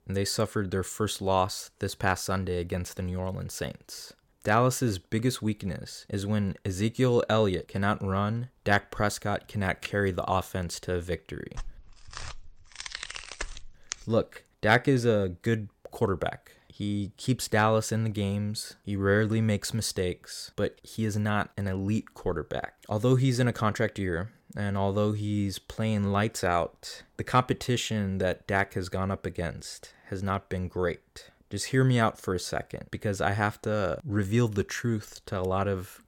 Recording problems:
none

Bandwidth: 17 kHz